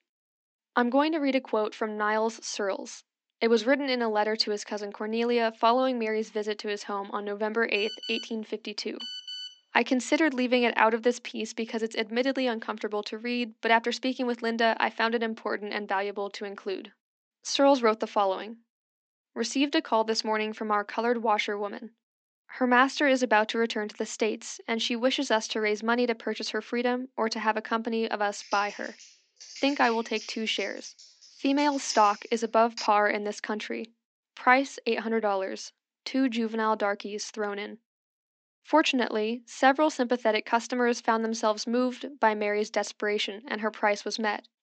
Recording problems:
high frequencies cut off; noticeable; nothing above 8 kHz
thin; very slightly; fading below 250 Hz
phone ringing; noticeable; from 8 to 9.5 s; peak 8 dB below the speech
keyboard typing; faint; from 28 to 33 s; peak 10 dB below the speech

